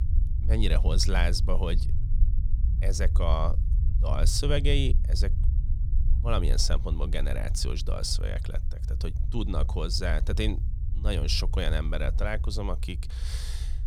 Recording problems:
low rumble; noticeable; throughout; 15 dB below the speech

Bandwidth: 18.5 kHz